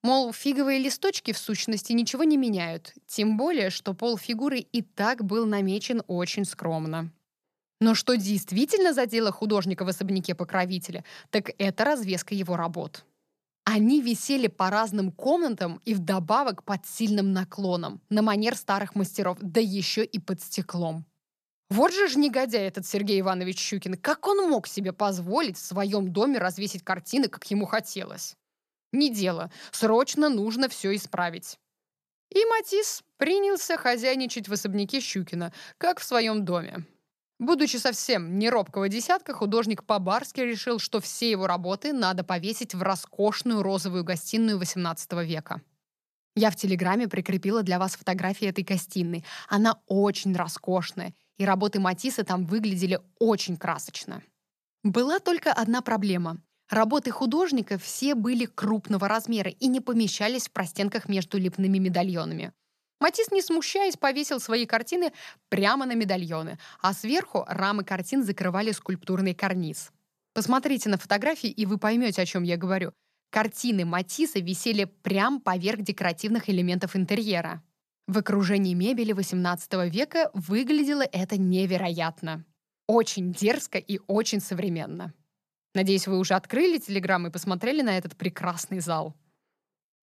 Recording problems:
none

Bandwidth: 14.5 kHz